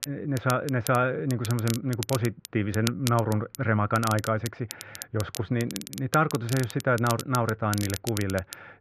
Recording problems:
muffled; very; fading above 2.5 kHz
crackle, like an old record; noticeable; 10 dB below the speech

